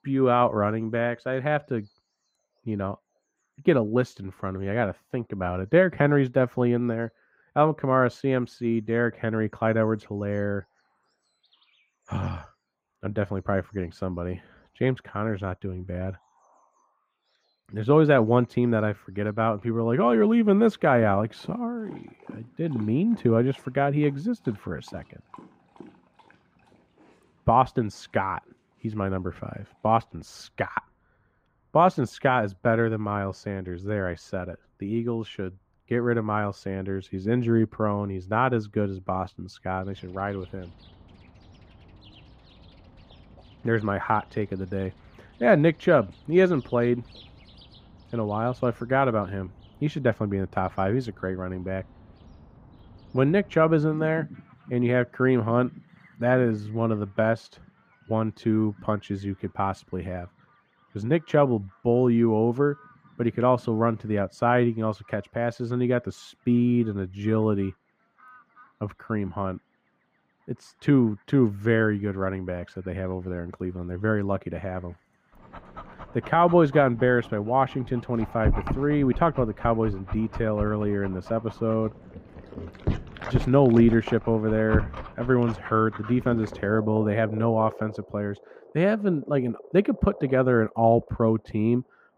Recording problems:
muffled; very; fading above 3.5 kHz
animal sounds; noticeable; throughout; 15 dB below the speech

